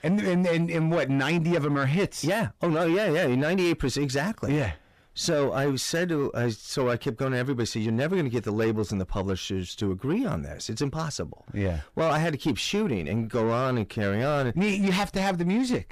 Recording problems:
distortion; slight; 10 dB below the speech

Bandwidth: 14.5 kHz